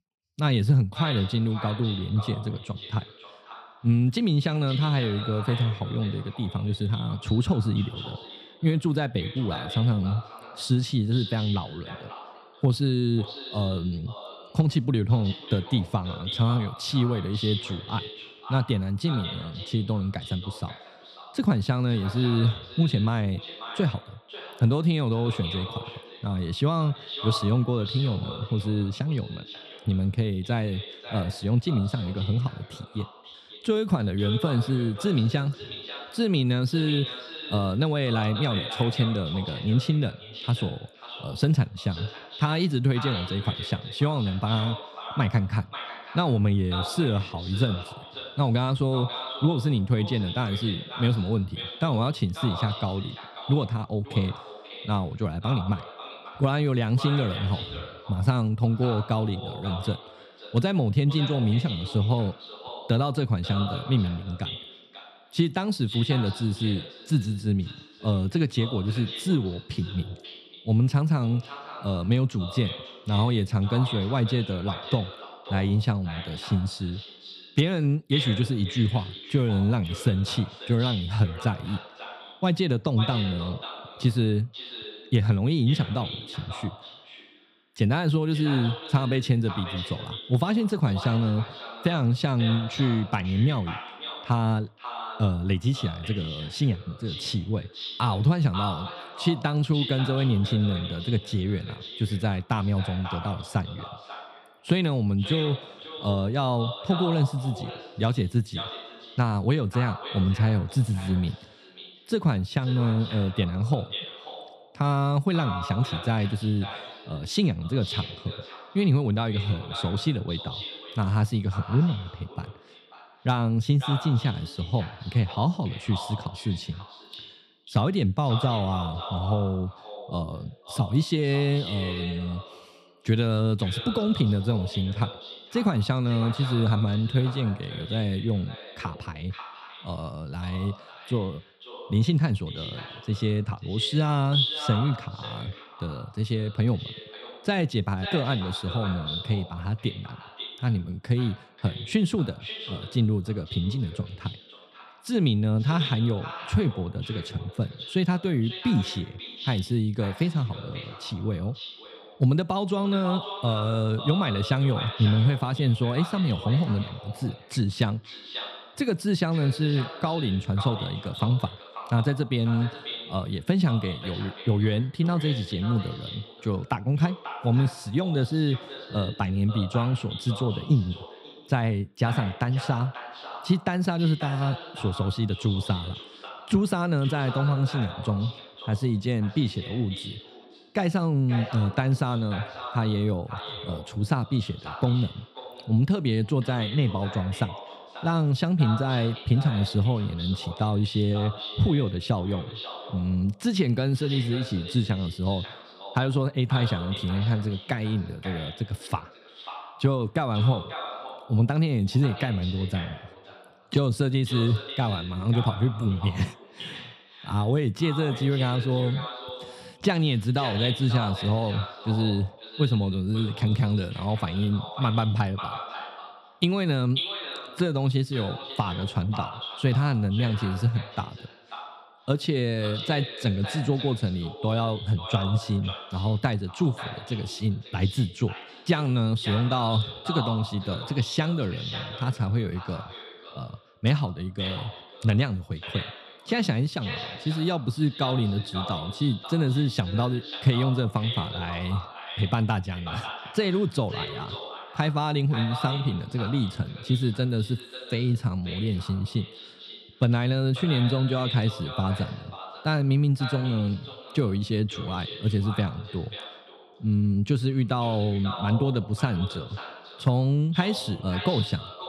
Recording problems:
echo of what is said; strong; throughout; 540 ms later, 10 dB below the speech

